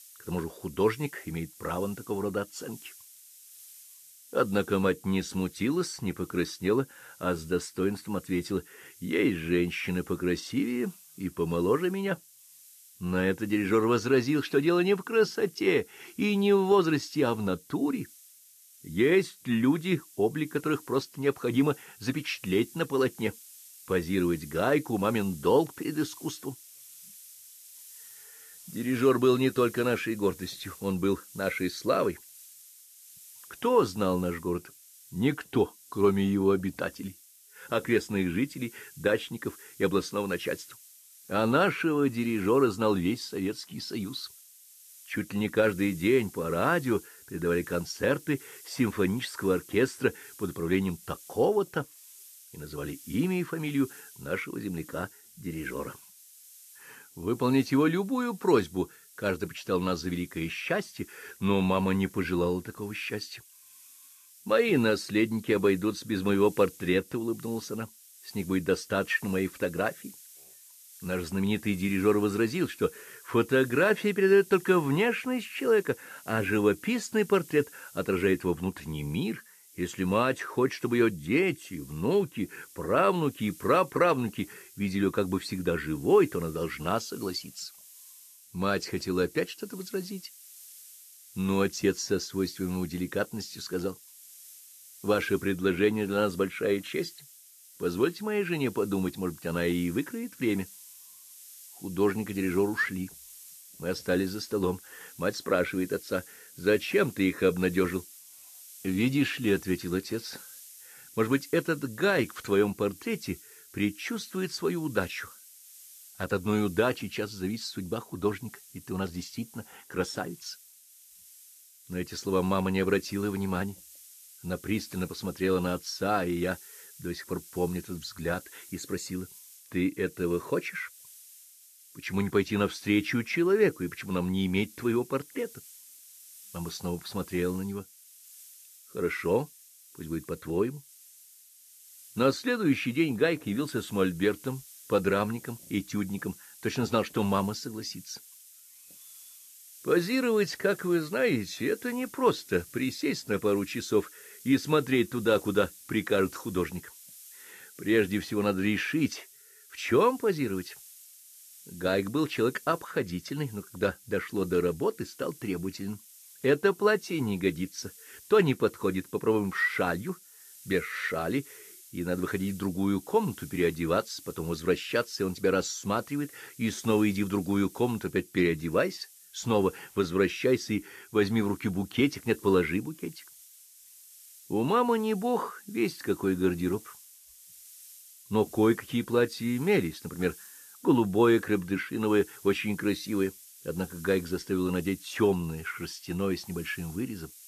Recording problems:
hiss; noticeable; throughout; 20 dB below the speech

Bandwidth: 14 kHz